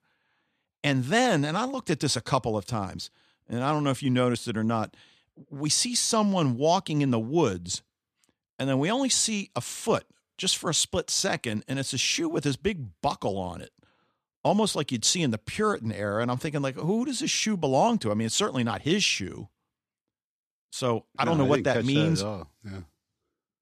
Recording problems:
none

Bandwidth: 14 kHz